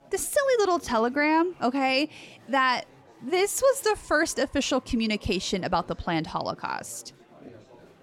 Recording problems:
chatter from many people; faint; throughout; 25 dB below the speech

